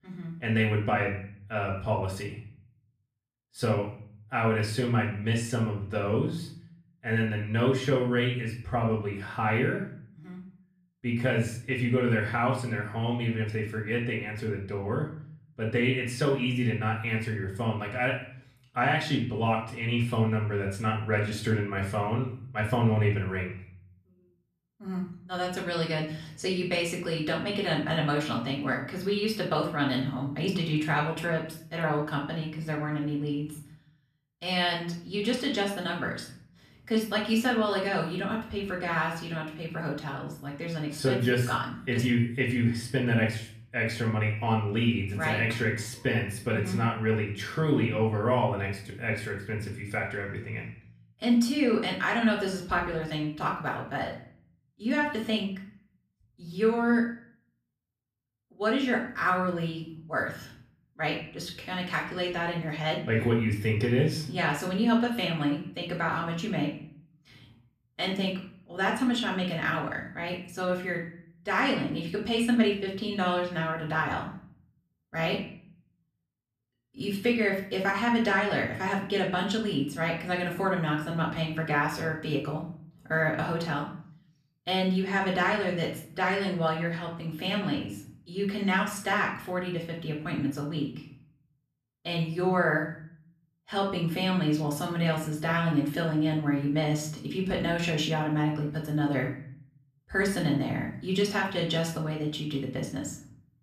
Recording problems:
off-mic speech; far
room echo; slight; dies away in 0.5 s

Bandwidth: 14.5 kHz